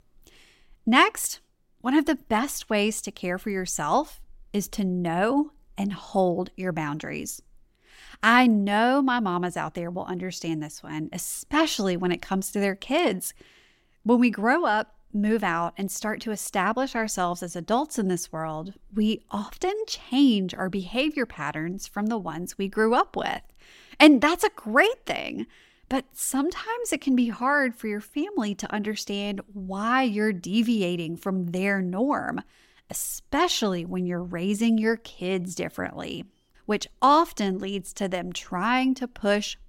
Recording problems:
none

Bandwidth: 16 kHz